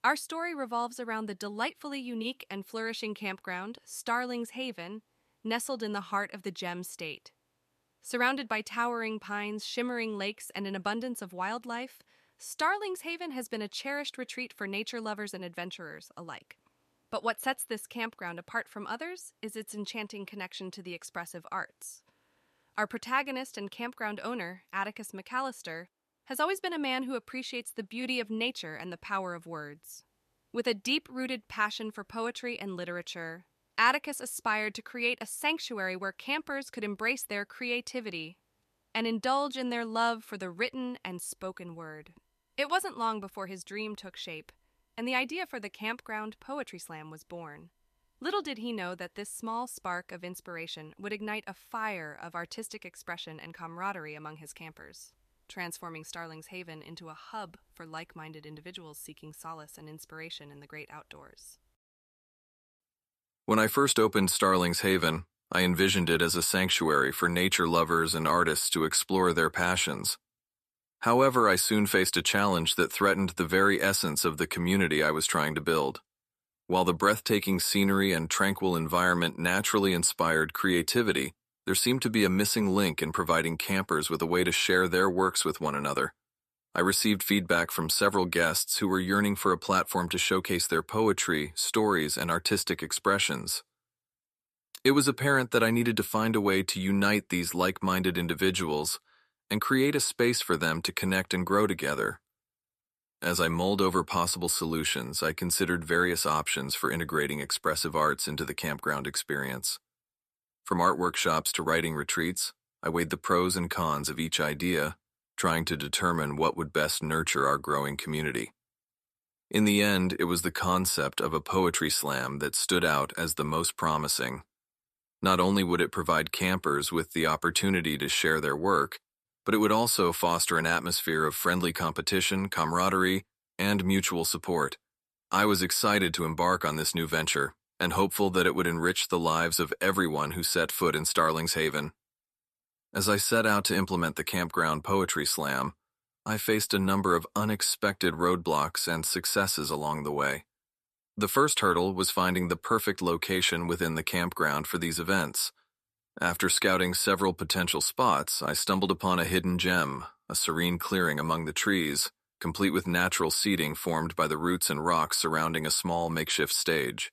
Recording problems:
none

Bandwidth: 14.5 kHz